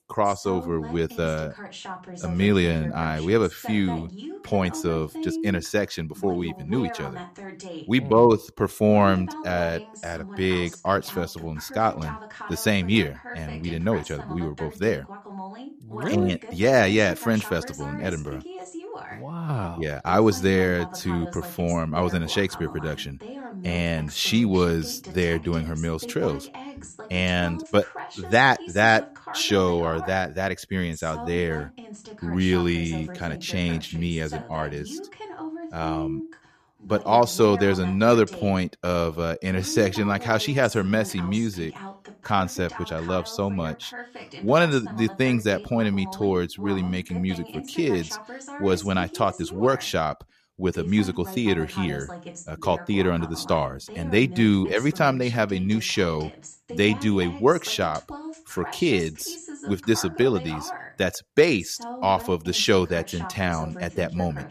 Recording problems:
voice in the background; noticeable; throughout; 15 dB below the speech

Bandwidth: 14.5 kHz